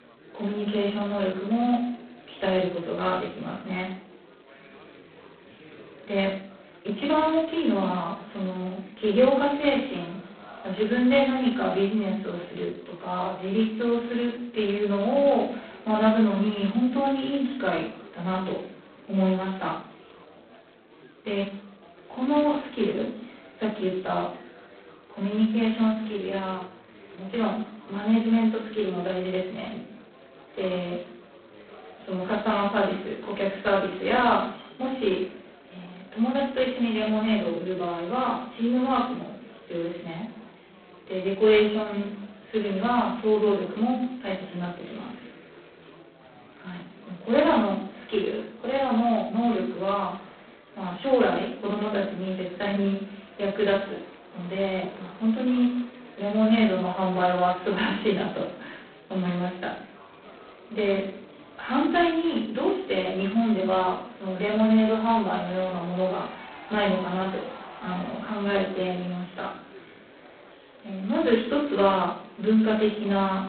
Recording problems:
phone-call audio; poor line; nothing above 4 kHz
off-mic speech; far
room echo; noticeable; dies away in 0.5 s
chatter from many people; faint; throughout; 20 dB below the speech

